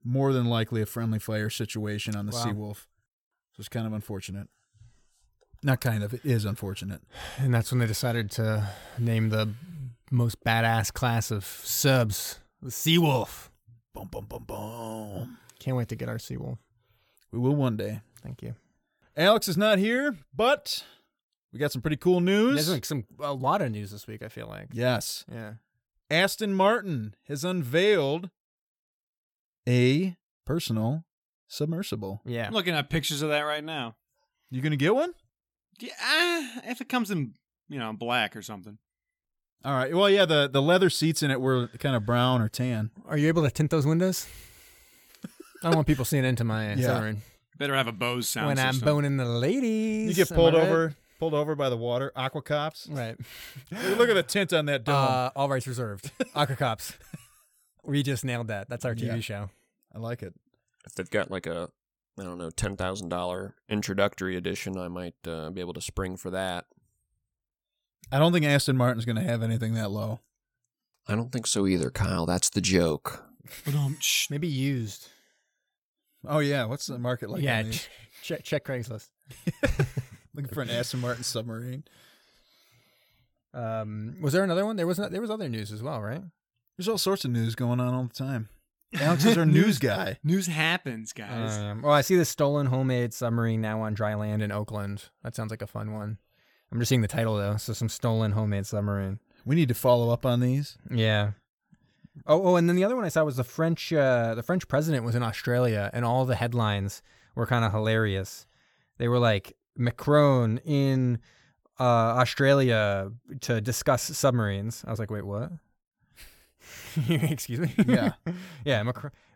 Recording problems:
none

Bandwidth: 17.5 kHz